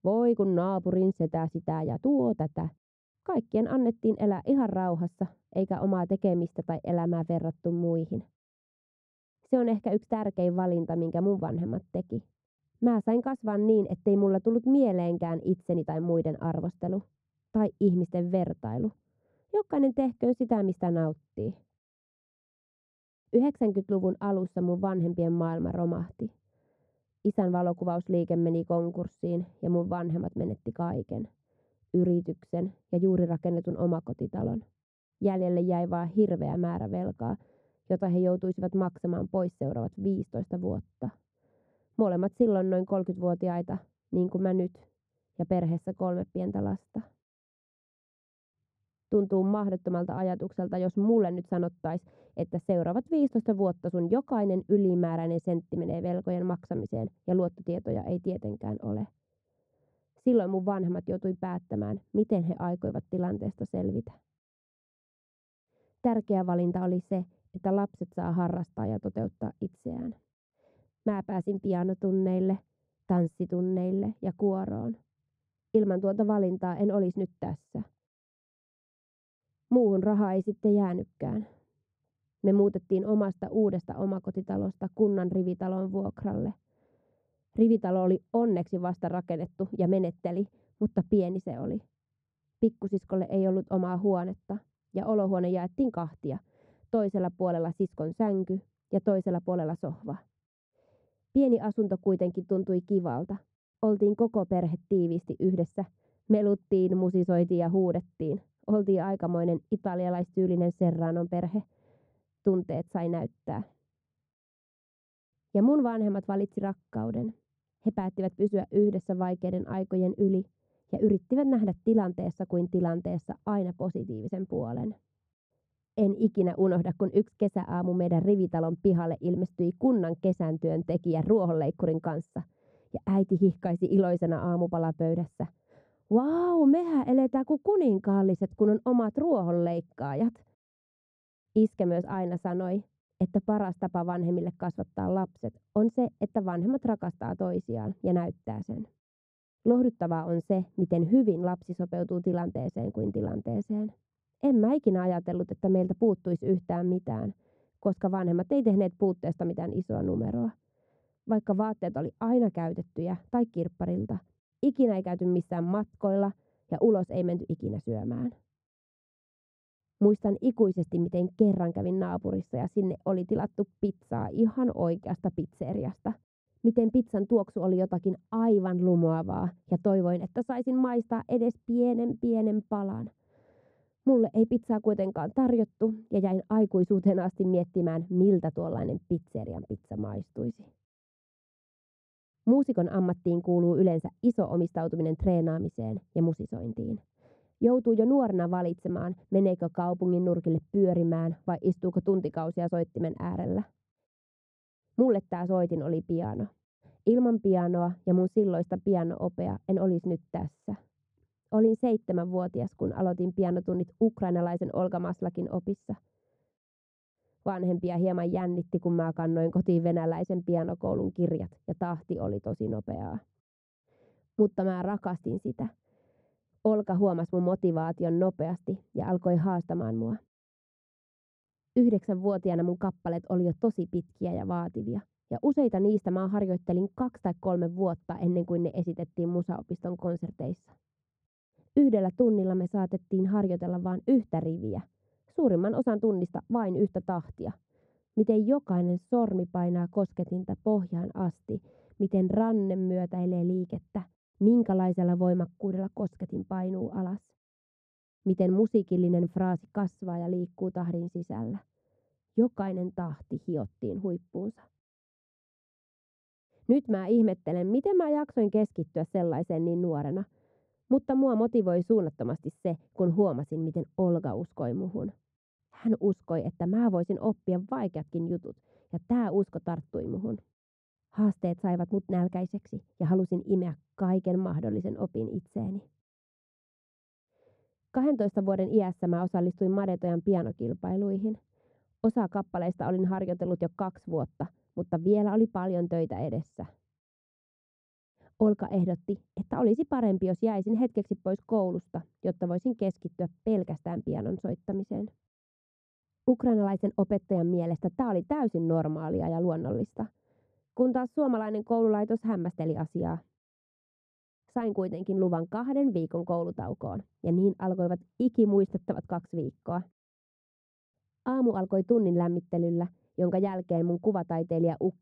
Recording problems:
muffled; very; fading above 1 kHz

